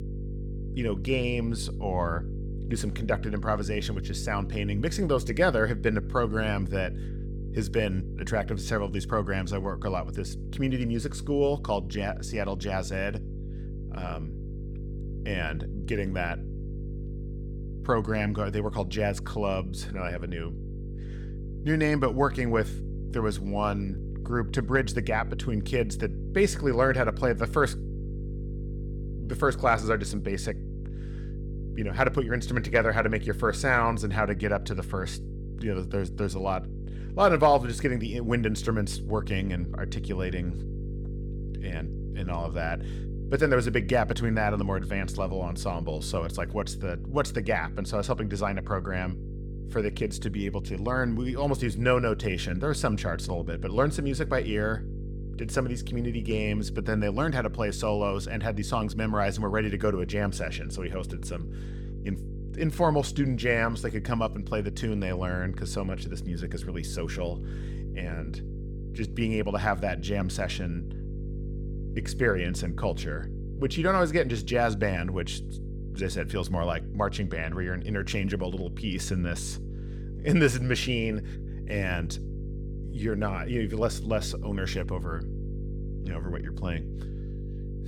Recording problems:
electrical hum; noticeable; throughout; 50 Hz, 15 dB below the speech

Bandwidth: 18 kHz